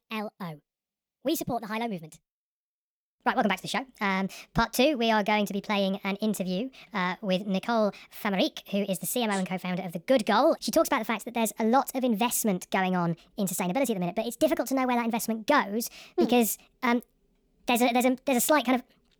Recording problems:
wrong speed and pitch; too fast and too high; 1.5 times normal speed

